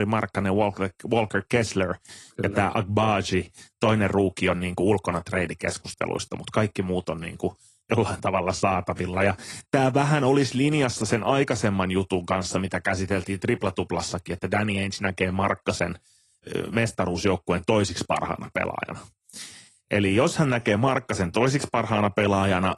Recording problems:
garbled, watery; slightly
abrupt cut into speech; at the start

